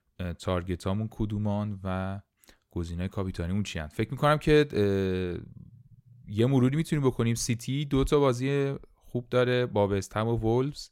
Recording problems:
none

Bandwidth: 16 kHz